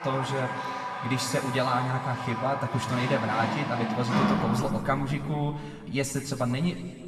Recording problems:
room echo; noticeable; dies away in 1.9 s
off-mic speech; somewhat distant
household noises; loud; throughout; 2 dB below the speech

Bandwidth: 13.5 kHz